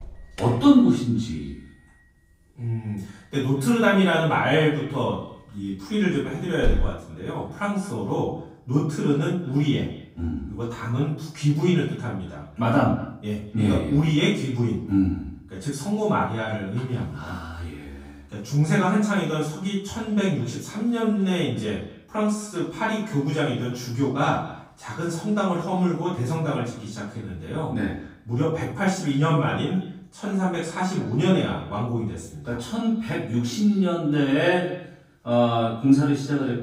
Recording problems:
off-mic speech; far
room echo; noticeable; dies away in 0.5 s
echo of what is said; faint; throughout; 220 ms later, 25 dB below the speech
alarm; noticeable; at 6.5 s; peak 4 dB below the speech

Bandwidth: 15.5 kHz